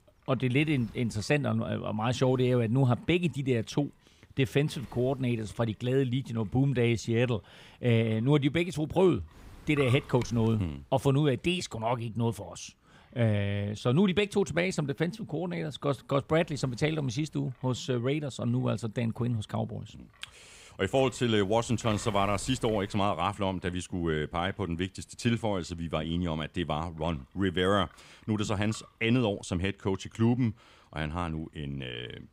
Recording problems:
wind noise on the microphone; occasional gusts; 20 dB below the speech

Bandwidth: 15.5 kHz